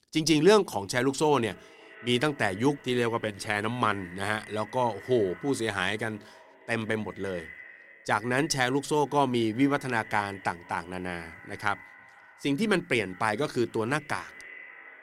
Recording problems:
echo of what is said; faint; throughout; 460 ms later, 20 dB below the speech

